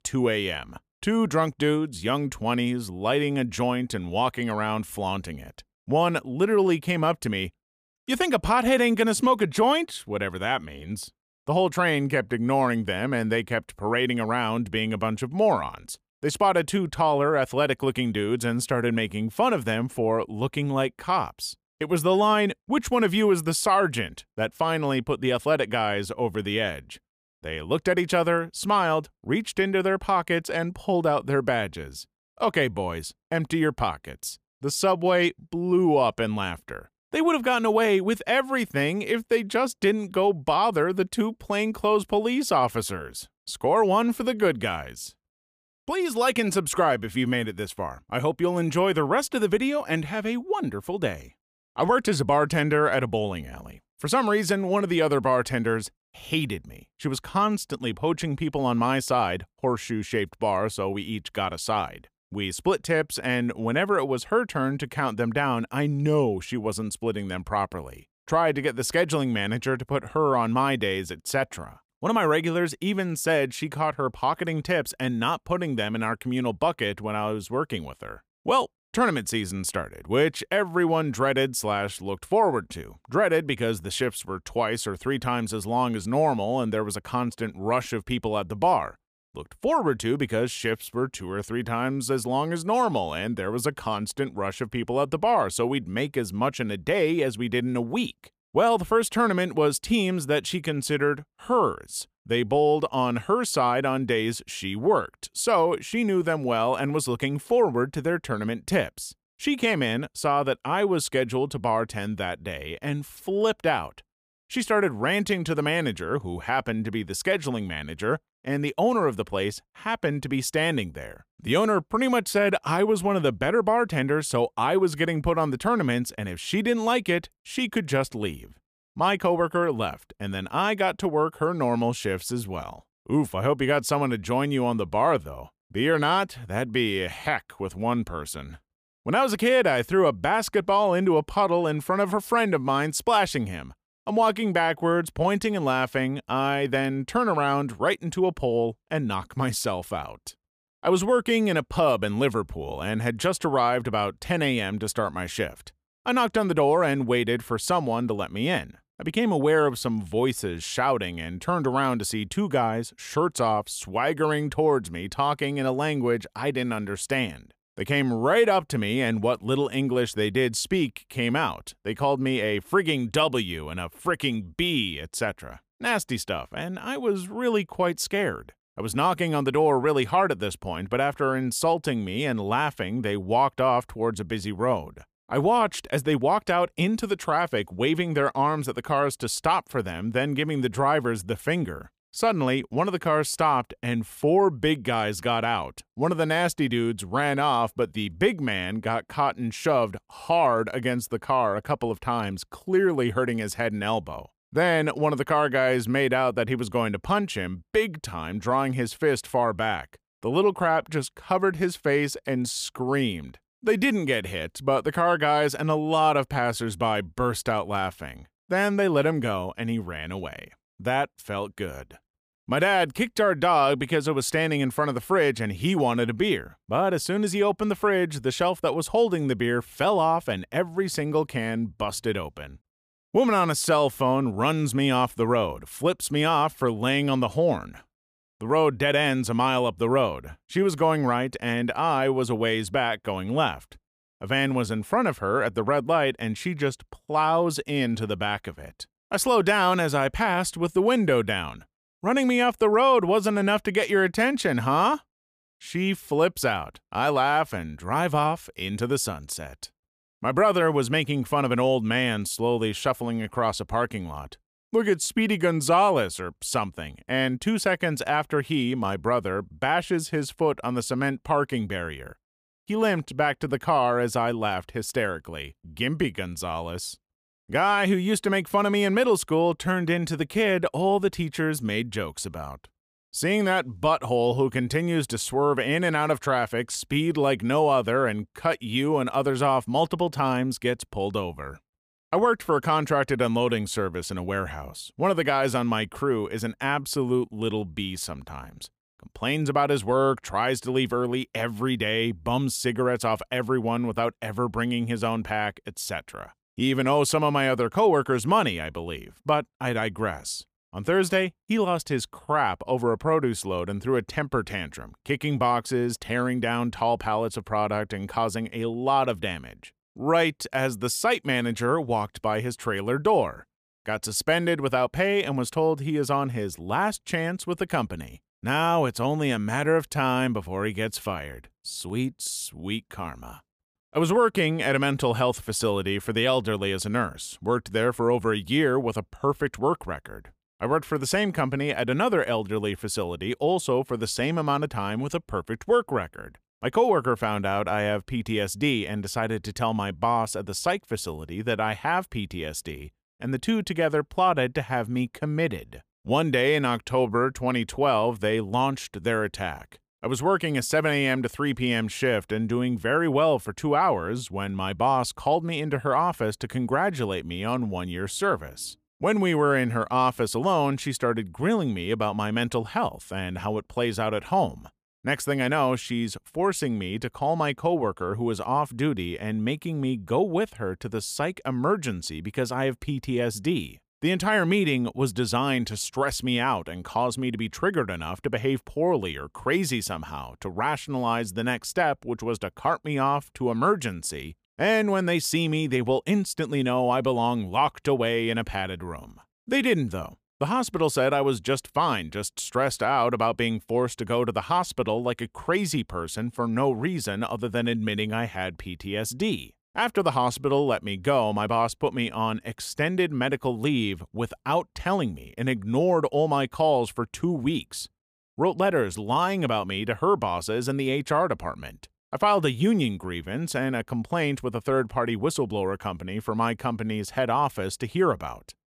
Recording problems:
none

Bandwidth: 15 kHz